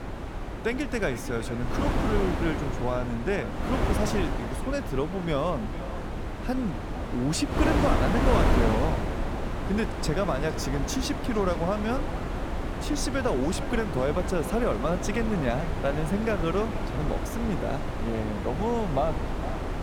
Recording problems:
echo of what is said; noticeable; throughout; 460 ms later, 15 dB below the speech
wind noise on the microphone; heavy; 3 dB below the speech

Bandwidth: 18 kHz